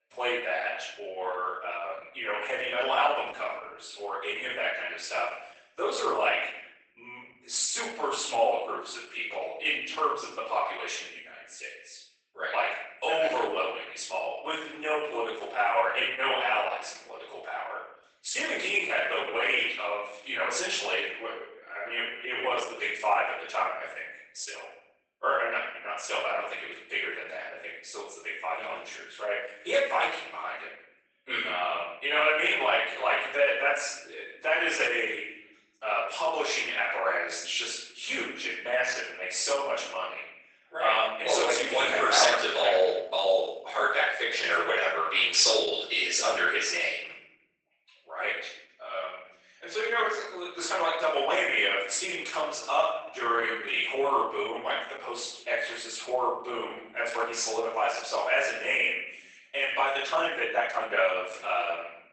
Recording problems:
off-mic speech; far
garbled, watery; badly; nothing above 8 kHz
thin; very; fading below 600 Hz
room echo; noticeable; dies away in 0.7 s
uneven, jittery; strongly; from 19 s to 1:01

